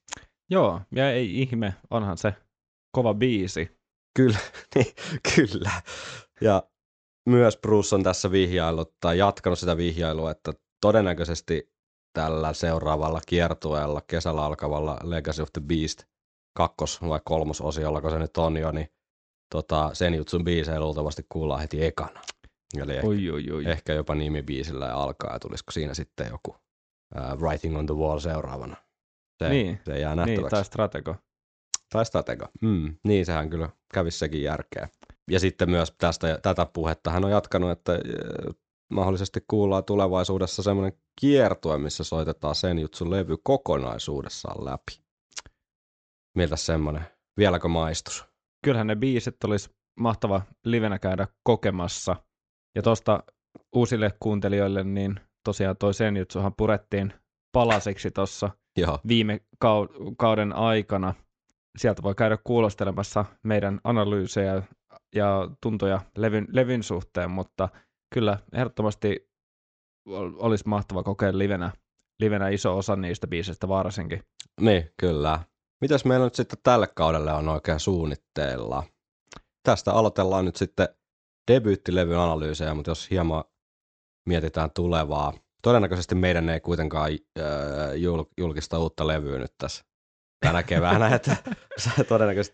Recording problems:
high frequencies cut off; noticeable; nothing above 8 kHz

